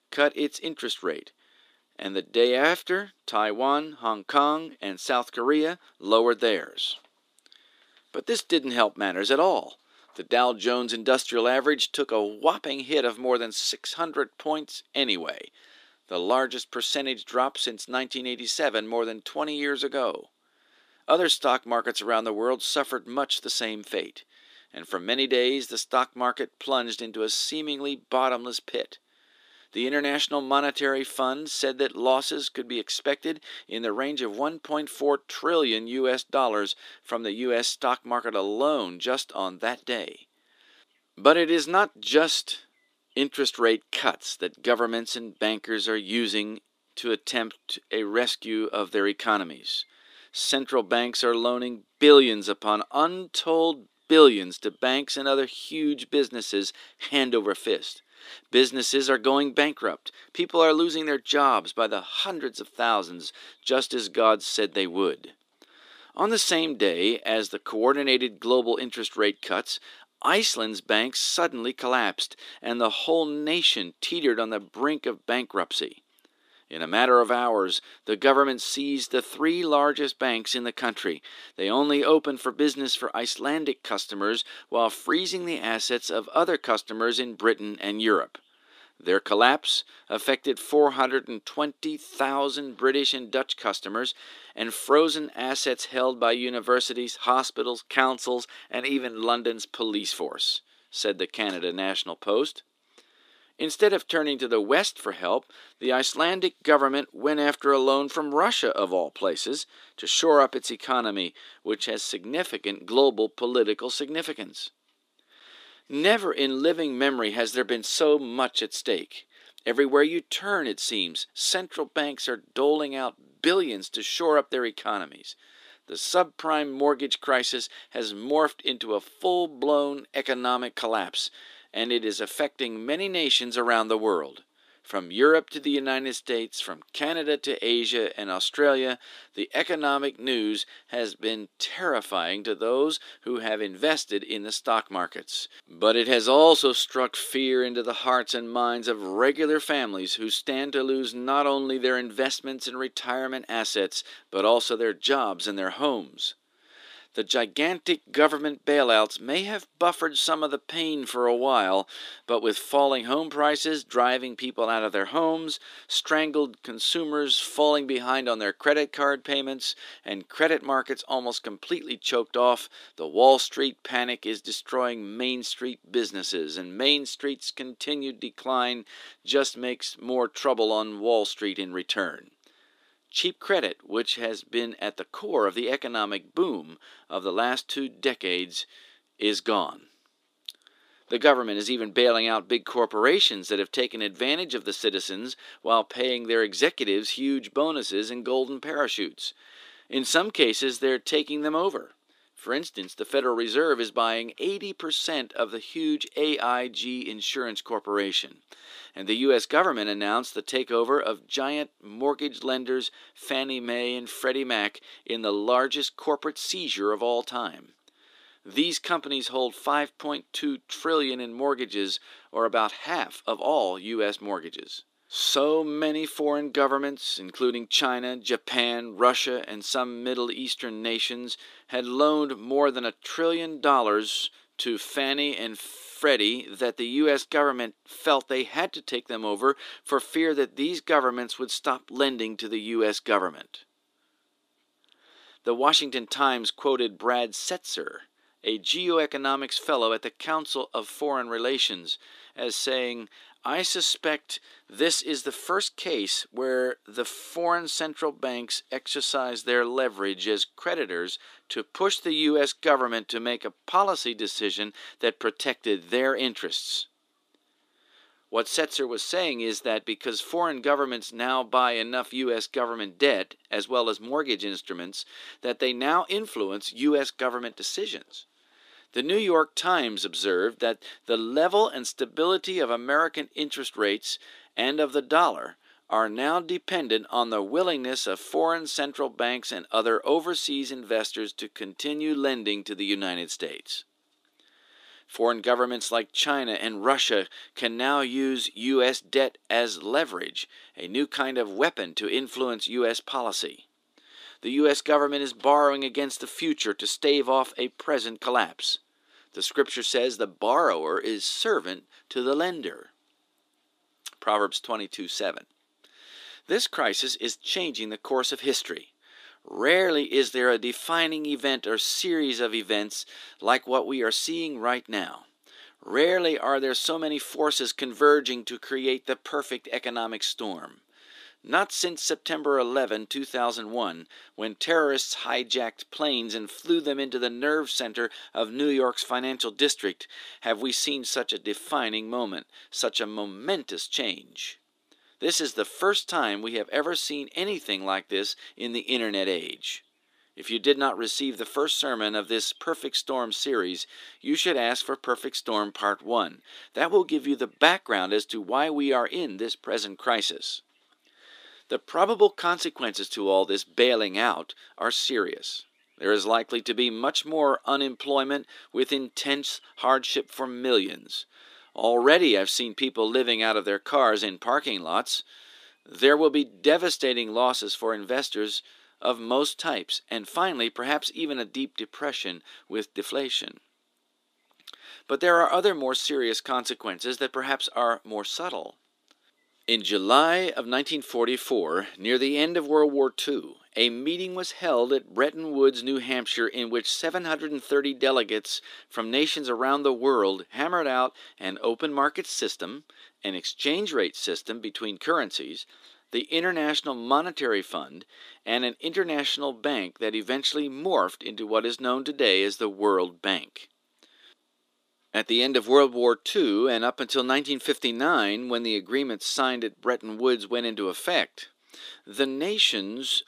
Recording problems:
thin; very slightly; fading below 300 Hz

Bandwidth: 14.5 kHz